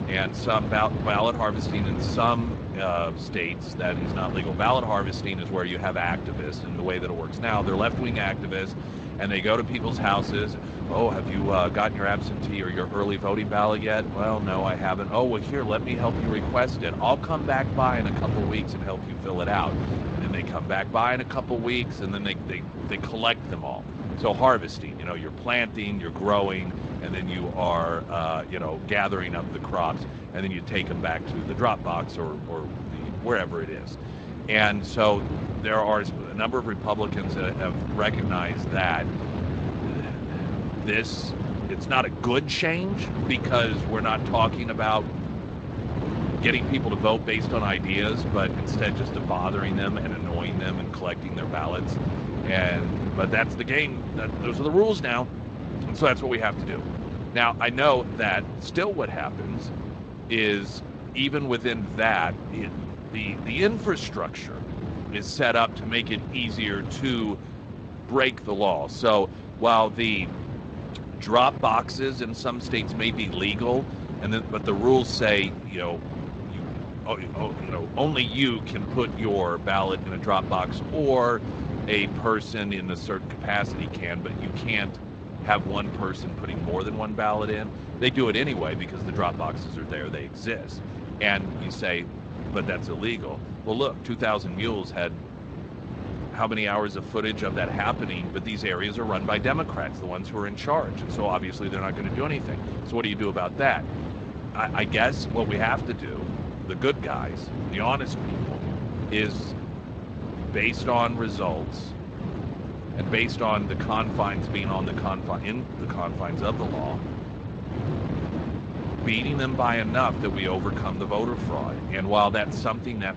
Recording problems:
garbled, watery; slightly; nothing above 7.5 kHz
wind noise on the microphone; occasional gusts; 10 dB below the speech

